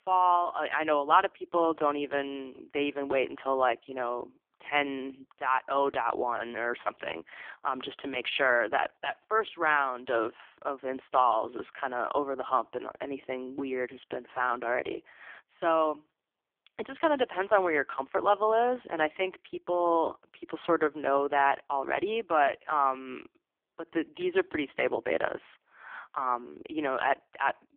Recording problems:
phone-call audio; poor line; nothing above 3.5 kHz

